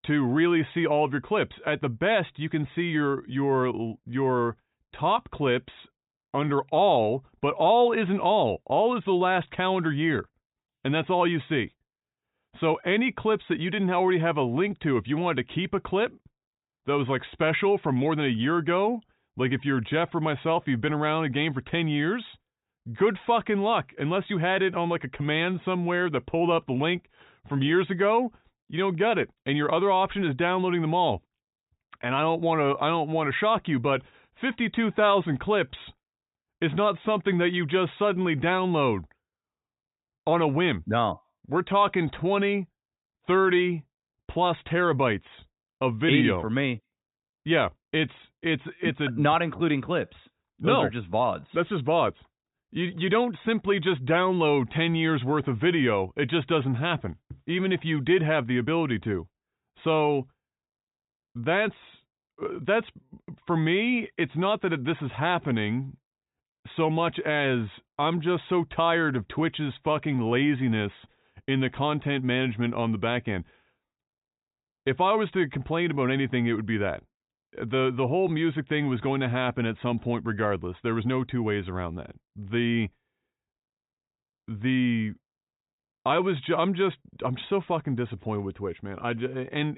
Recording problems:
high frequencies cut off; severe; nothing above 4 kHz

